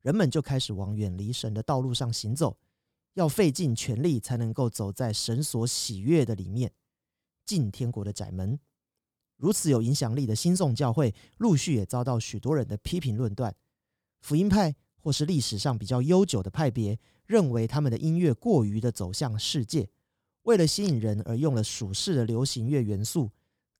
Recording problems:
none

